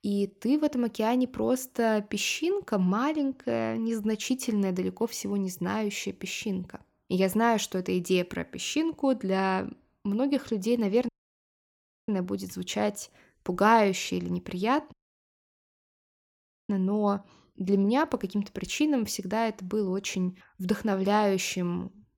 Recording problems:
audio cutting out; at 11 s for 1 s and at 15 s for 2 s

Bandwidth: 17.5 kHz